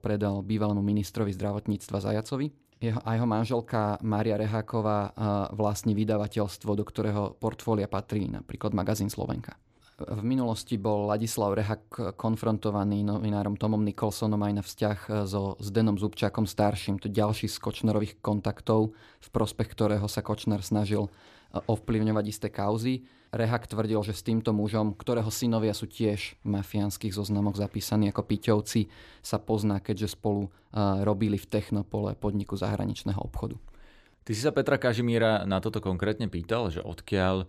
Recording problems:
none

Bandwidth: 14.5 kHz